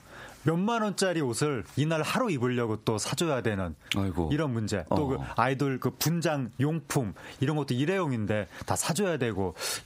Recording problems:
squashed, flat; heavily

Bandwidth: 15.5 kHz